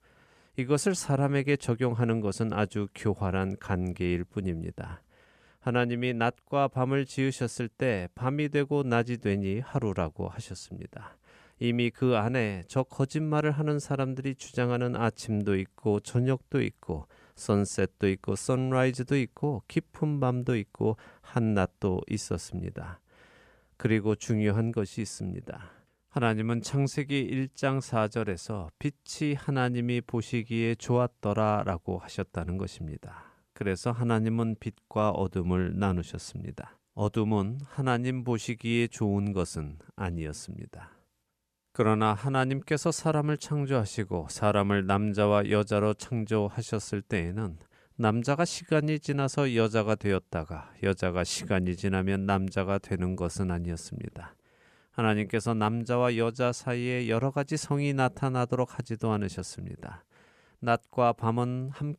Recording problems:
none

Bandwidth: 14.5 kHz